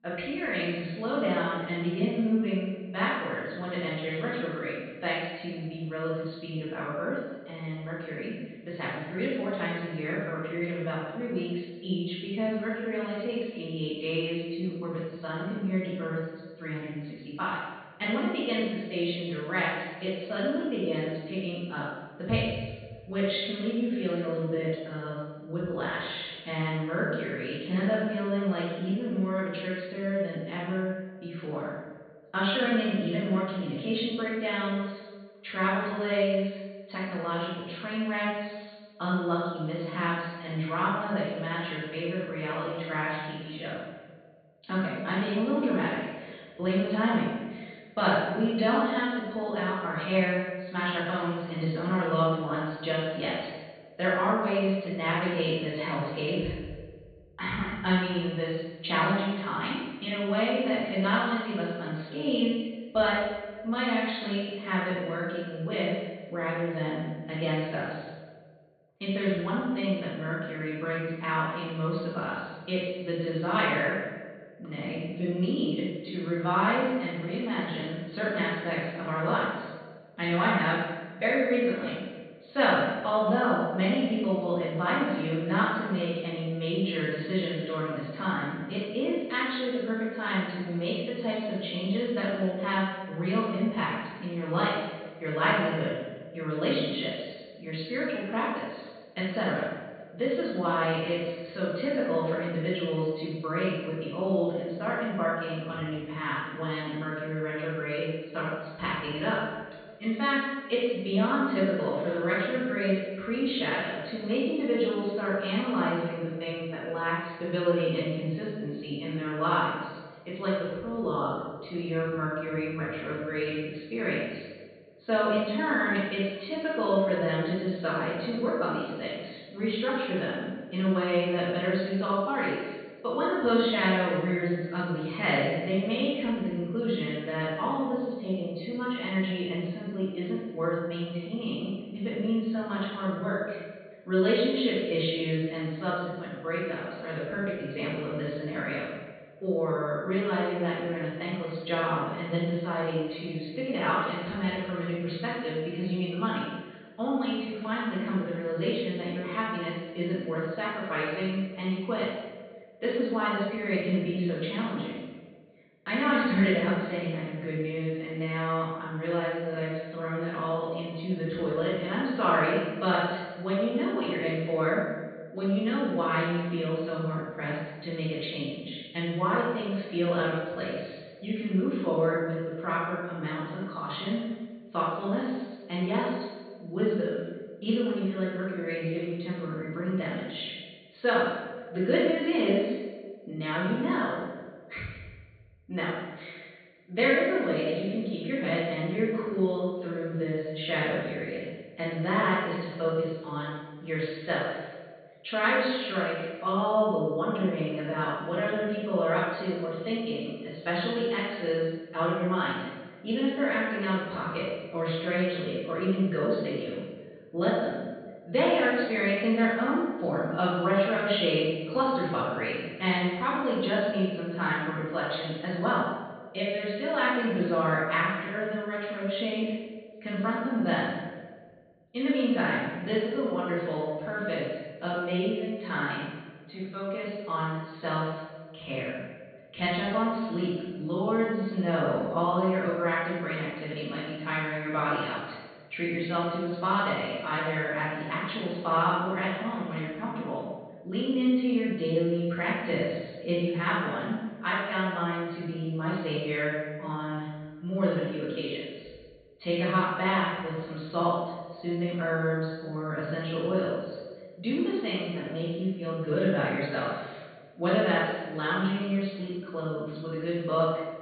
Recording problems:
room echo; strong; dies away in 1.1 s
off-mic speech; far
high frequencies cut off; severe; nothing above 4.5 kHz

